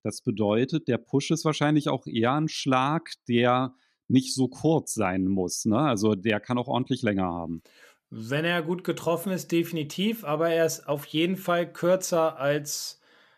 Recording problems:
none

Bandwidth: 14.5 kHz